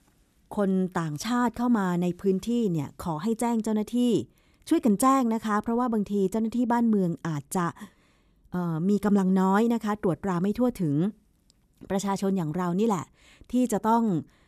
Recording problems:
none

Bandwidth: 14.5 kHz